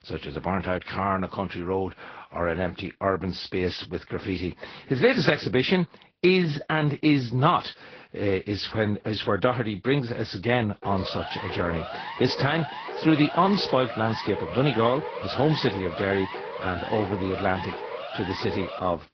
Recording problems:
high frequencies cut off; noticeable; nothing above 5.5 kHz
garbled, watery; slightly
siren; noticeable; from 11 s on; peak 8 dB below the speech

